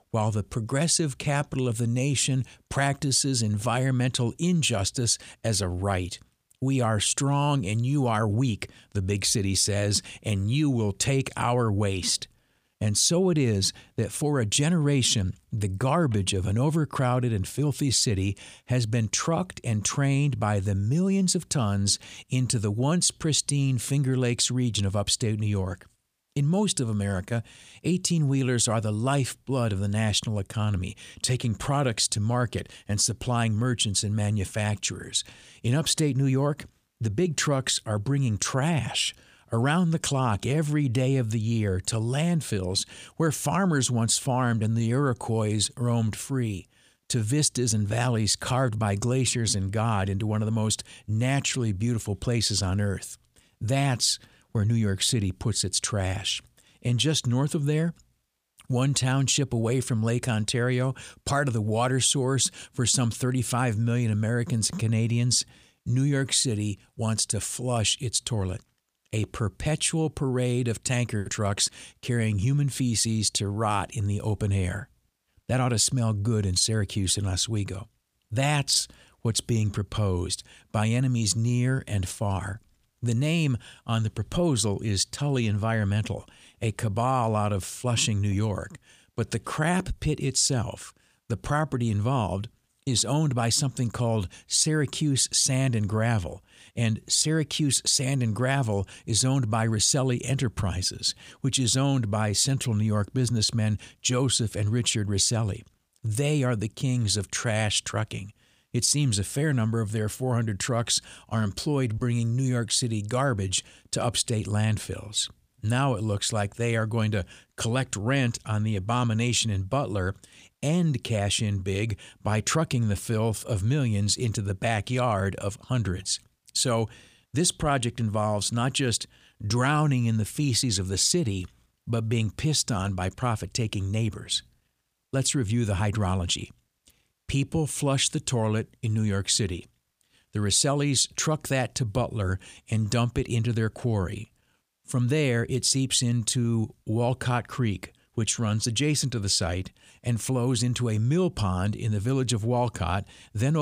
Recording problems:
abrupt cut into speech; at the end

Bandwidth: 15 kHz